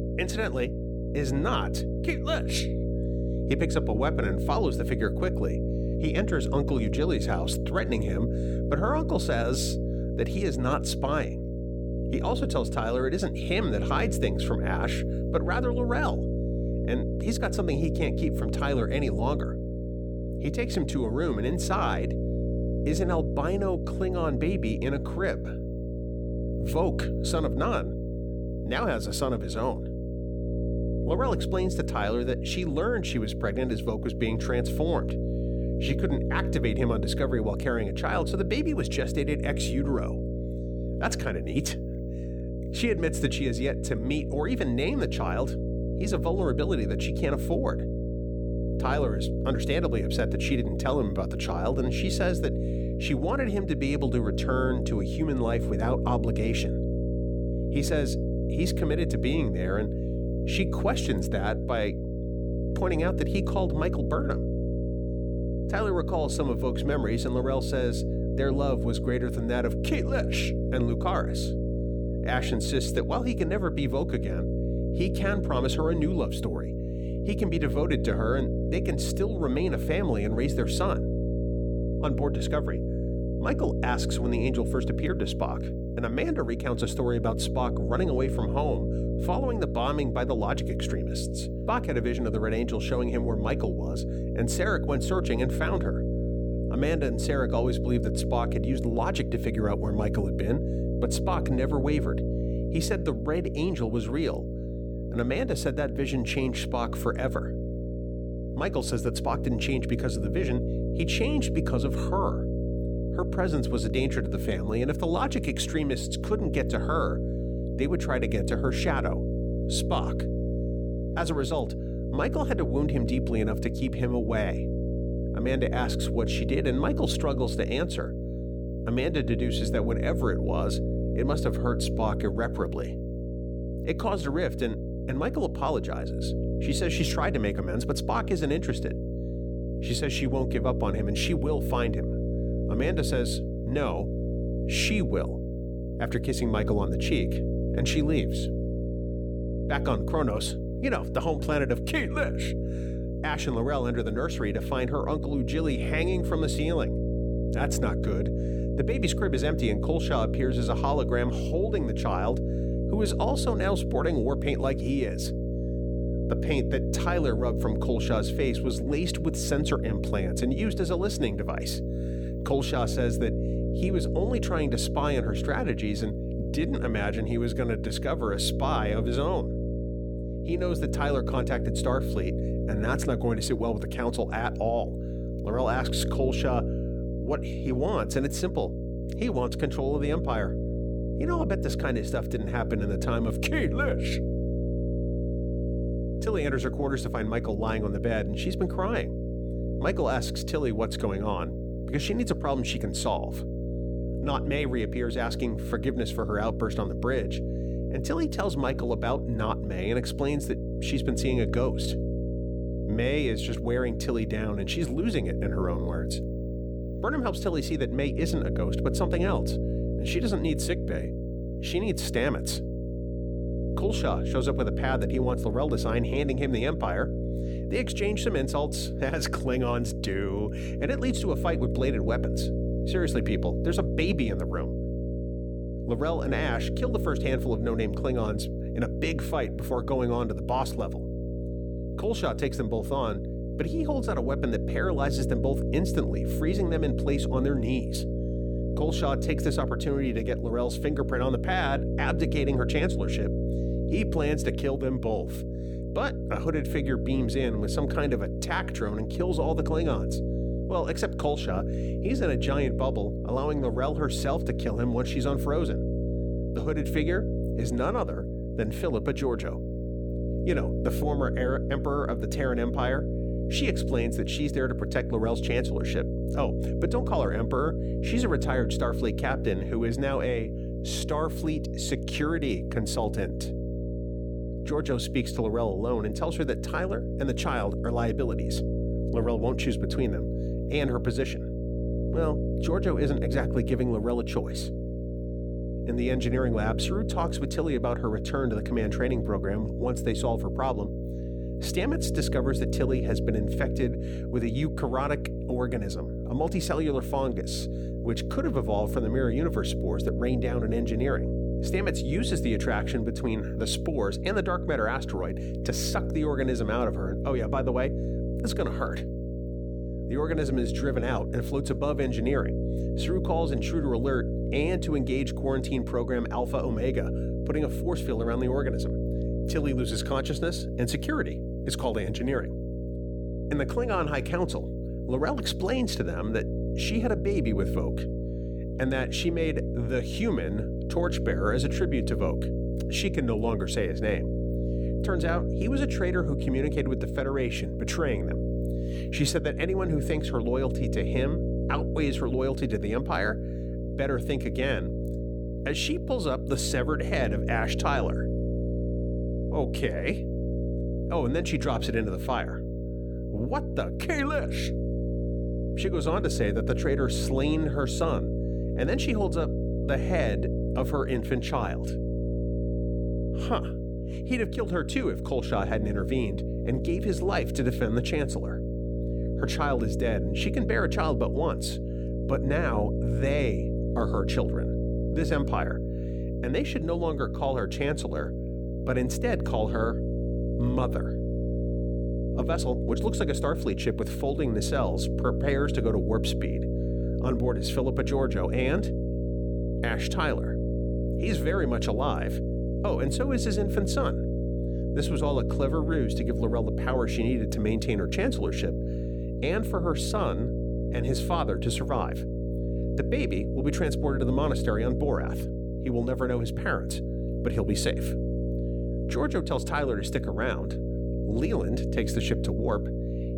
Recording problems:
electrical hum; loud; throughout; 60 Hz, 6 dB below the speech

